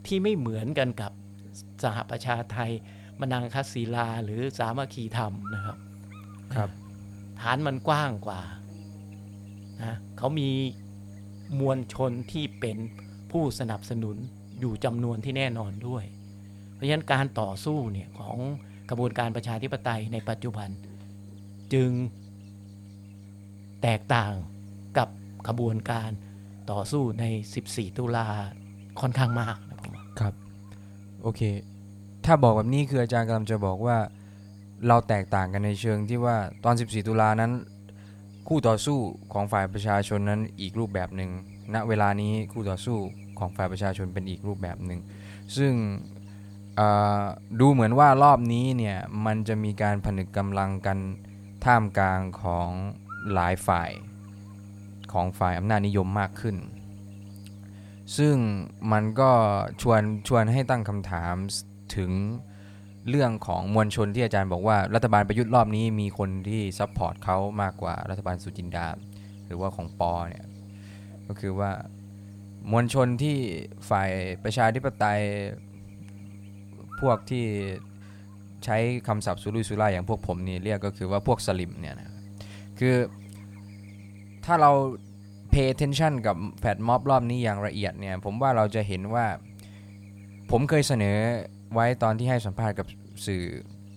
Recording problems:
electrical hum; faint; throughout; 50 Hz, 25 dB below the speech

